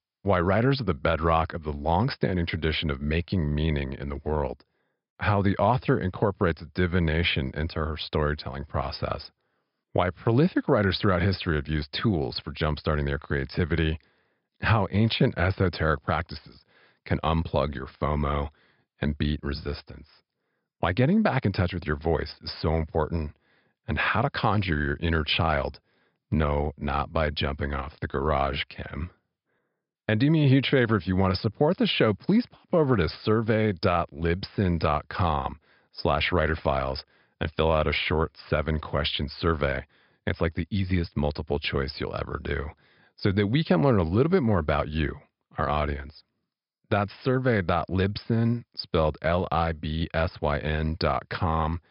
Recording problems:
high frequencies cut off; noticeable; nothing above 5.5 kHz

